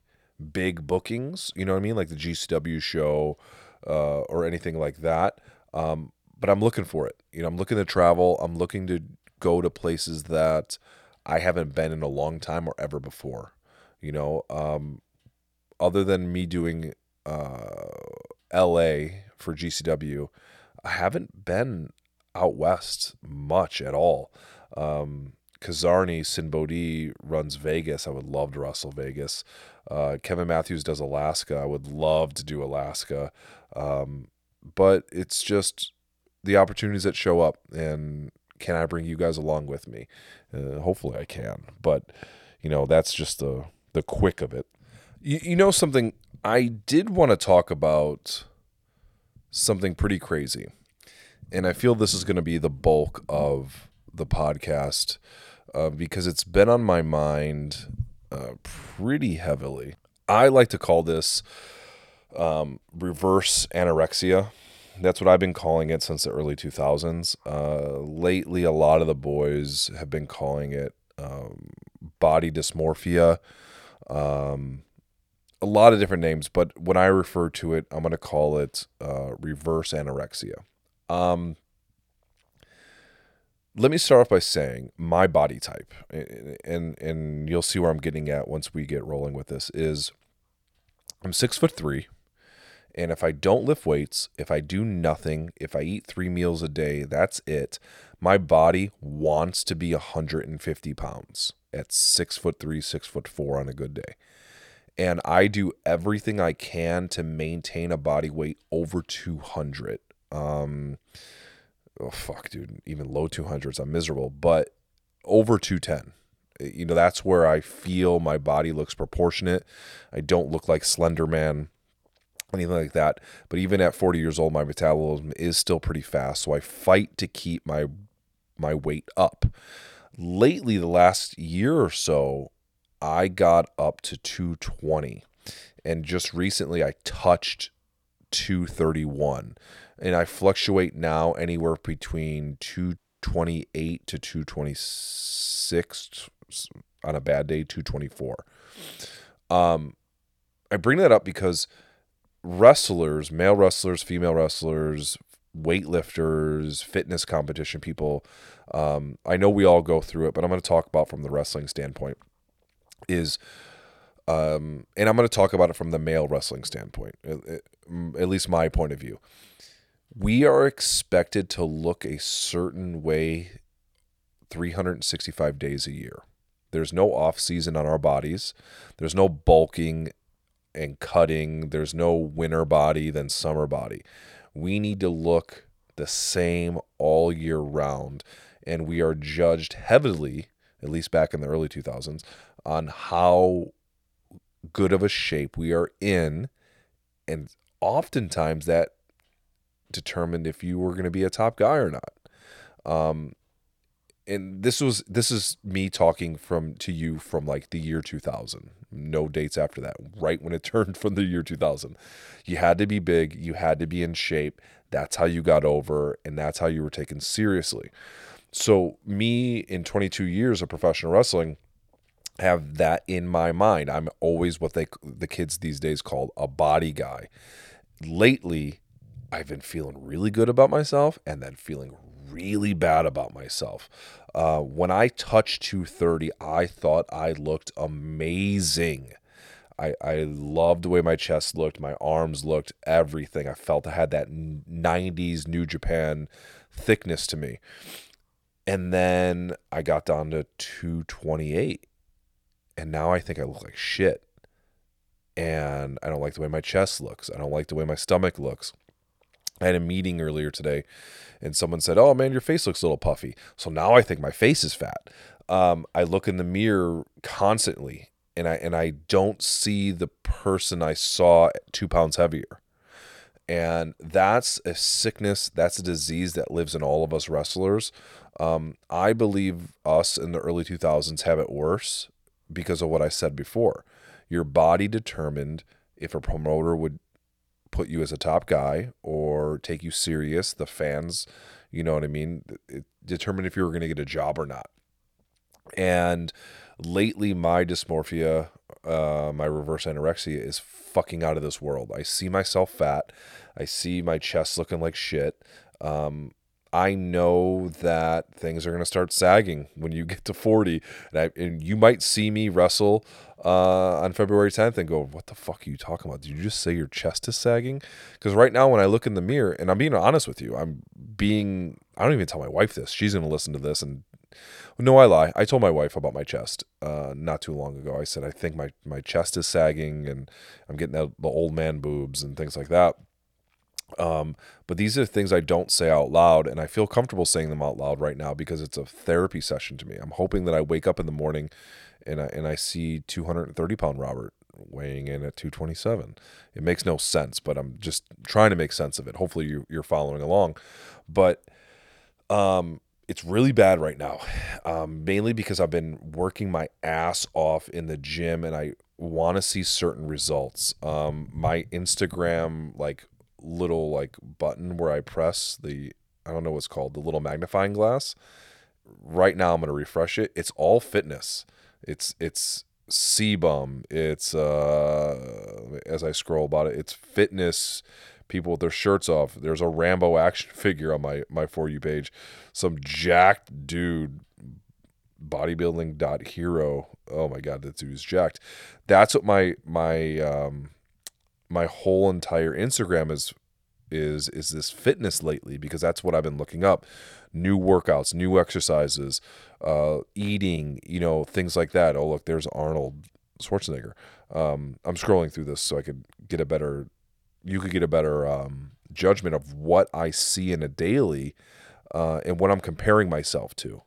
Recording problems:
audio cutting out; at 2:23

